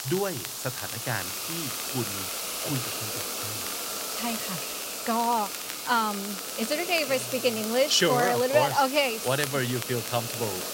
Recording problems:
hiss; loud; throughout; 4 dB below the speech
crackle, like an old record; noticeable; 15 dB below the speech

